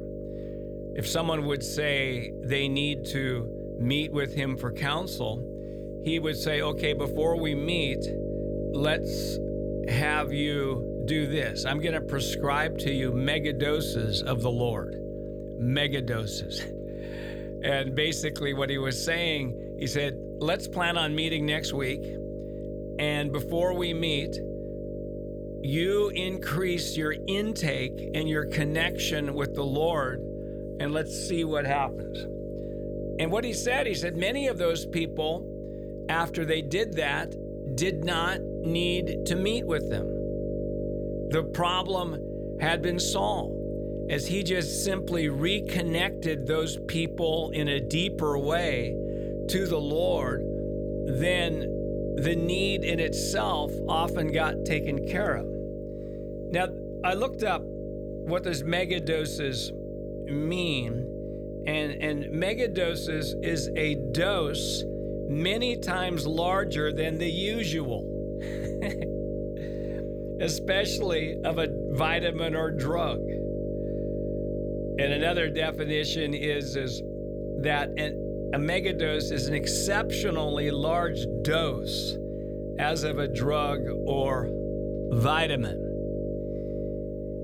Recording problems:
electrical hum; loud; throughout; 50 Hz, 7 dB below the speech

